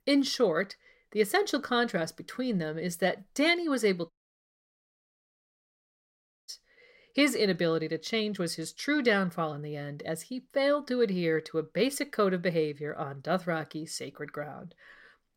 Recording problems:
audio cutting out; at 4 s for 2.5 s

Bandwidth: 16 kHz